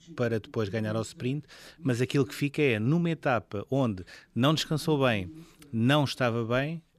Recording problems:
voice in the background; faint; throughout; 20 dB below the speech

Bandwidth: 14.5 kHz